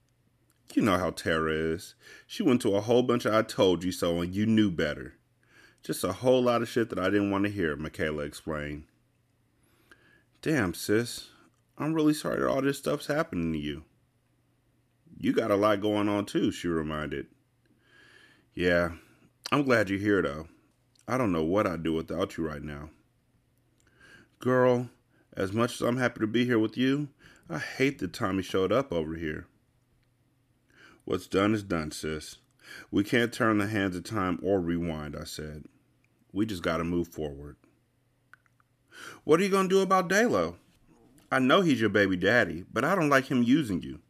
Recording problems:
none

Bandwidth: 14.5 kHz